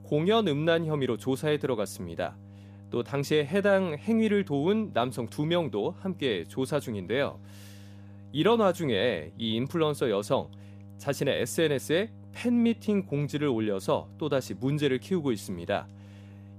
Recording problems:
electrical hum; faint; throughout; 50 Hz, 30 dB below the speech

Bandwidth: 15 kHz